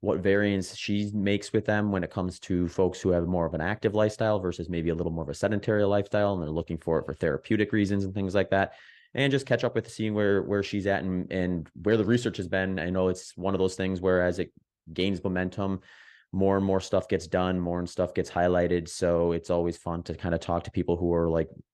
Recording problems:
none

